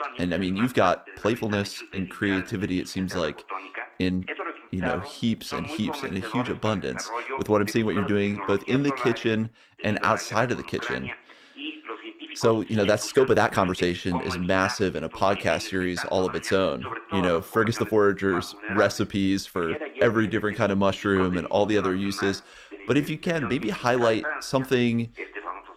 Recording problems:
voice in the background; loud; throughout; 10 dB below the speech
uneven, jittery; strongly; from 1 to 23 s

